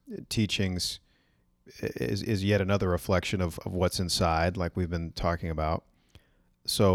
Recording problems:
abrupt cut into speech; at the end

